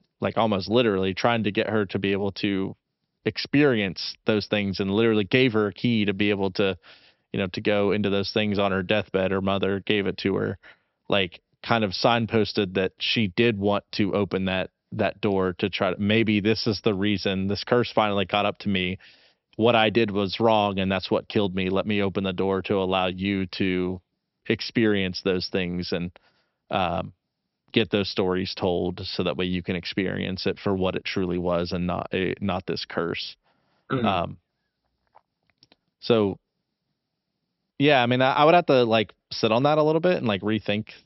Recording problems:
high frequencies cut off; noticeable; nothing above 5.5 kHz

